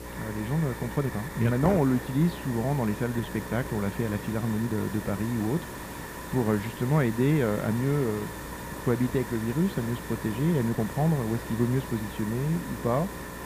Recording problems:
muffled; slightly; fading above 3 kHz
electrical hum; noticeable; throughout; 60 Hz, 15 dB below the speech
hiss; noticeable; throughout; 10 dB below the speech
uneven, jittery; slightly; from 1 to 11 s

